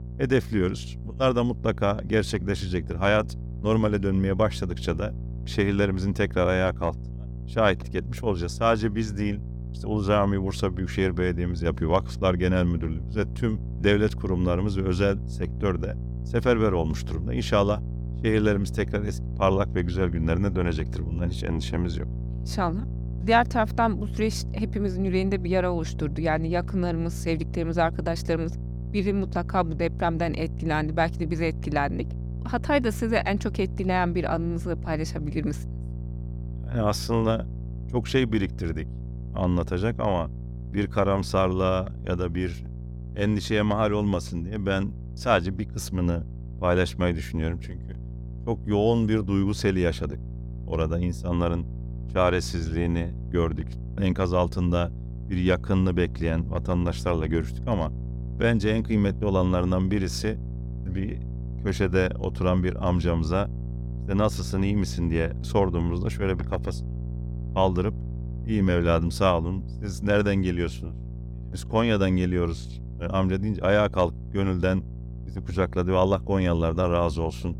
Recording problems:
electrical hum; noticeable; throughout; 60 Hz, 20 dB below the speech

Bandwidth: 17 kHz